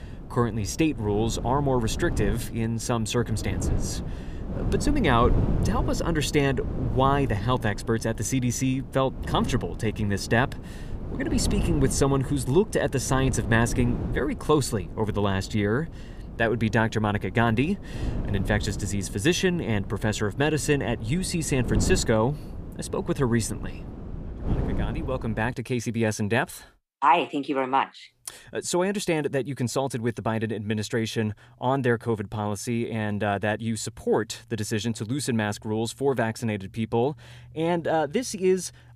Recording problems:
wind noise on the microphone; occasional gusts; until 26 s; 15 dB below the speech

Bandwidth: 15 kHz